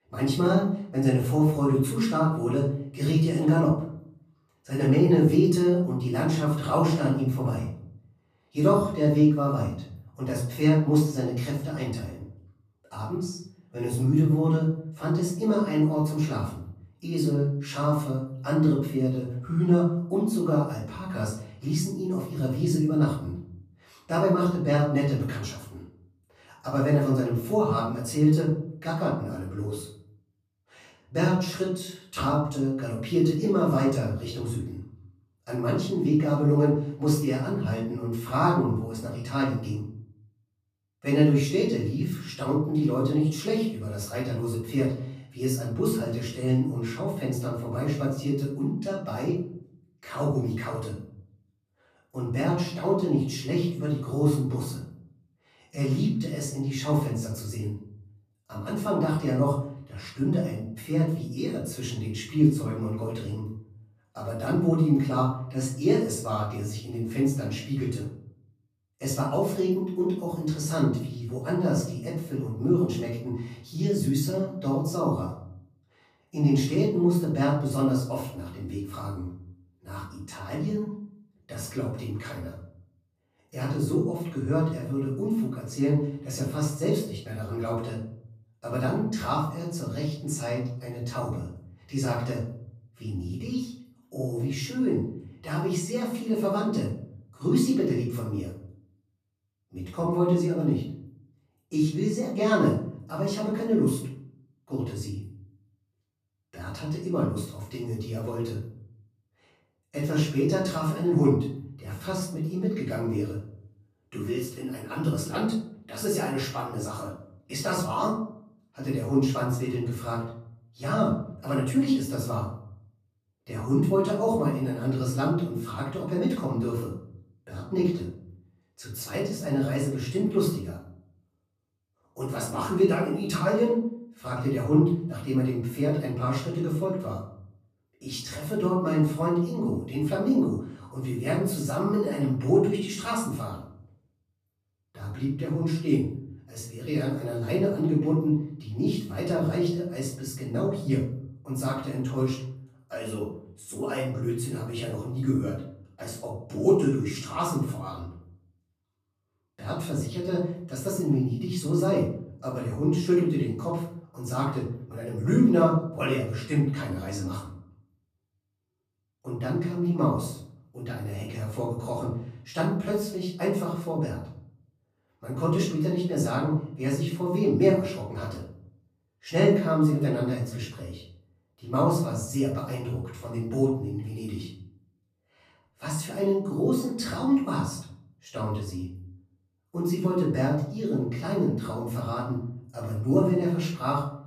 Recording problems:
off-mic speech; far
room echo; noticeable; dies away in 0.5 s

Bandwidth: 15 kHz